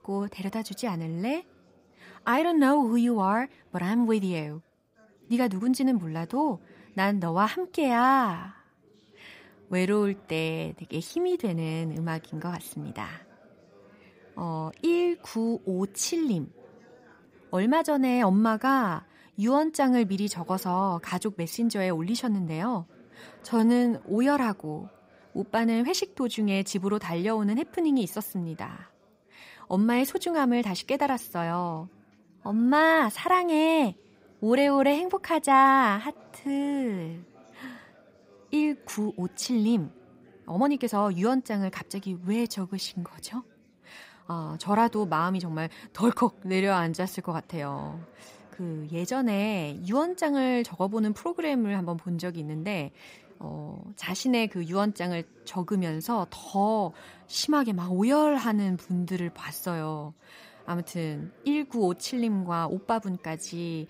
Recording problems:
chatter from many people; faint; throughout; 30 dB below the speech
uneven, jittery; strongly; from 3 to 59 s

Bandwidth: 15.5 kHz